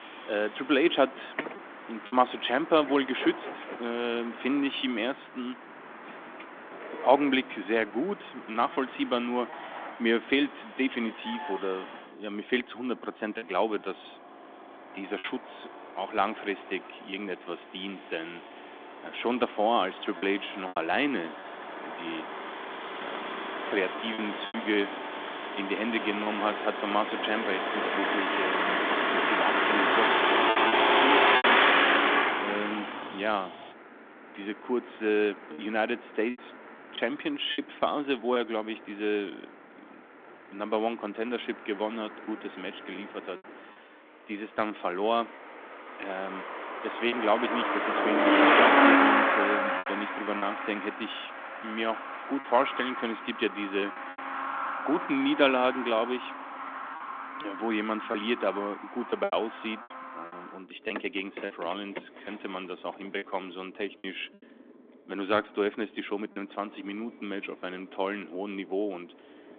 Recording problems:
phone-call audio; nothing above 3.5 kHz
traffic noise; very loud; throughout; 3 dB above the speech
choppy; occasionally; 3% of the speech affected

